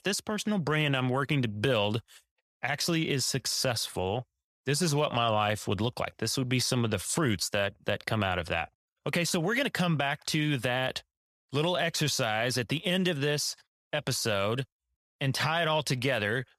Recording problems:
none

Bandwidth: 14 kHz